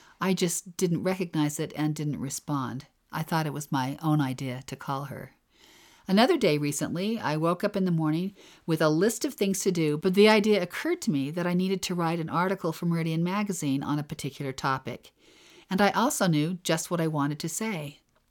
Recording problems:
none

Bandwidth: 17.5 kHz